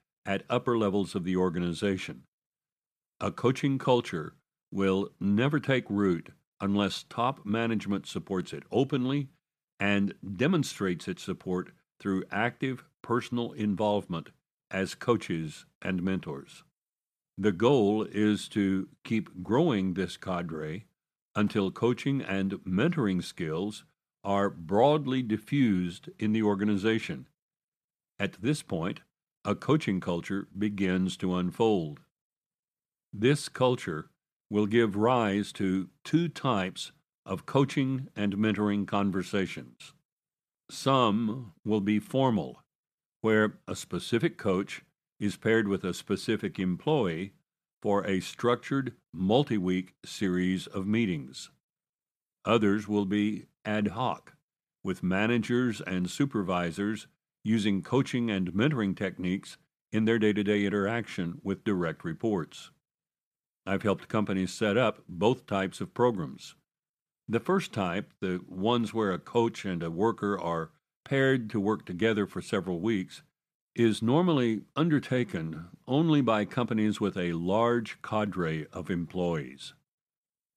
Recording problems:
none

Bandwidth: 14.5 kHz